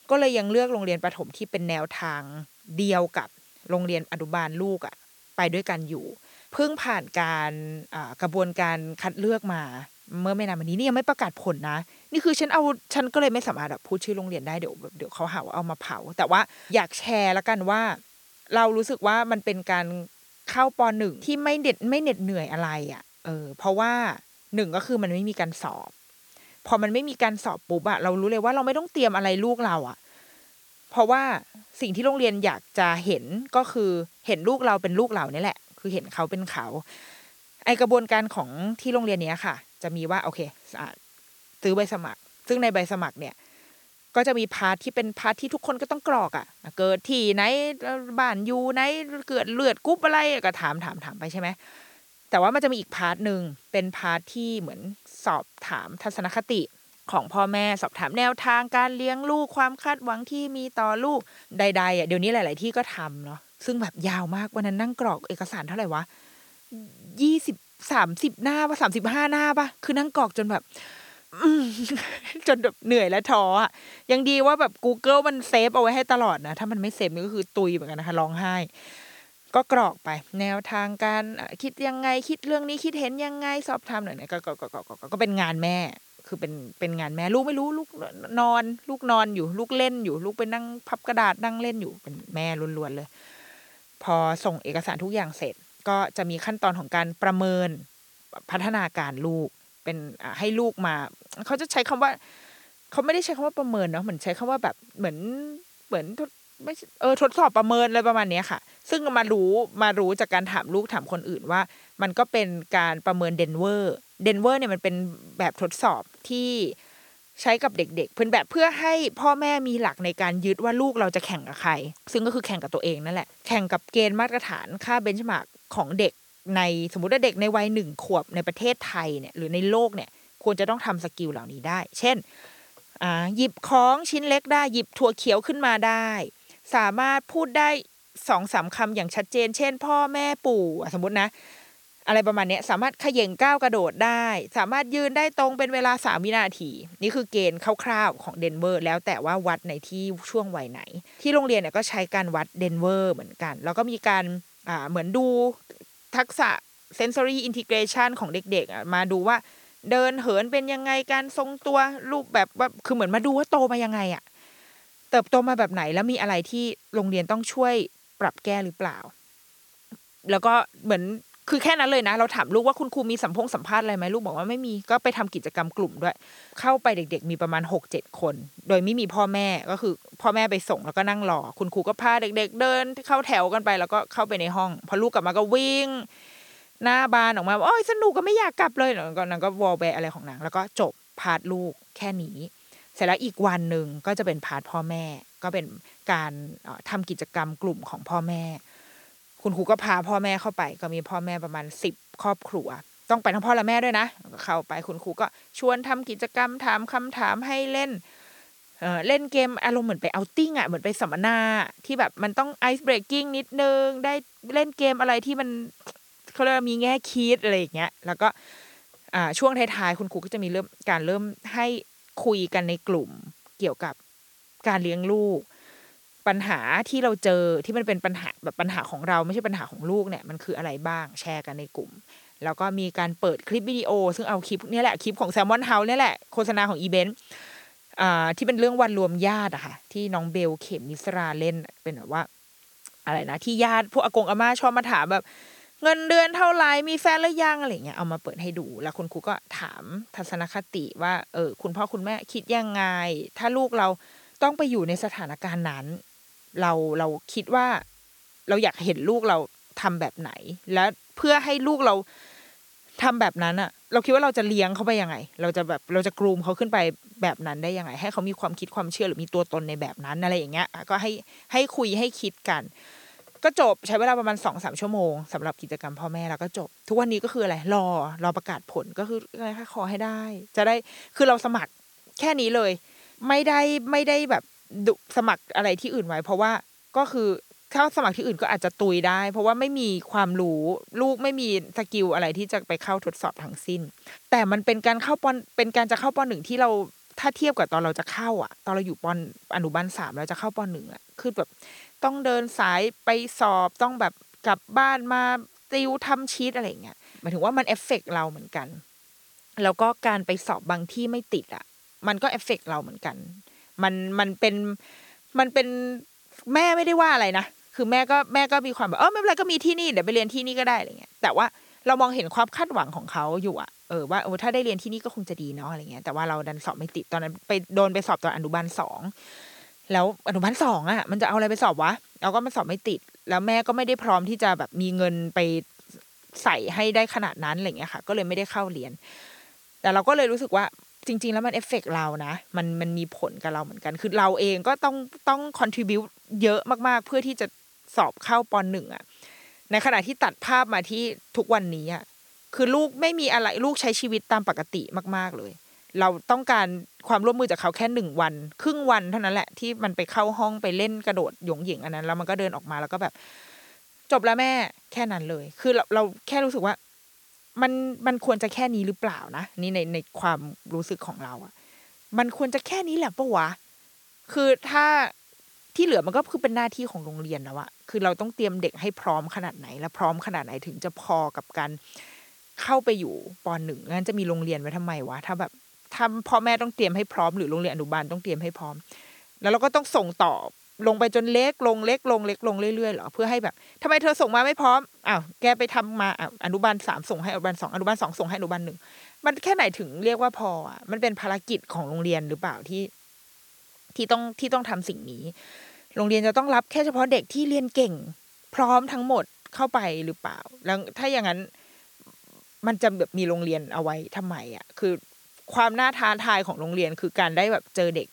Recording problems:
hiss; faint; throughout; 30 dB below the speech

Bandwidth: 18.5 kHz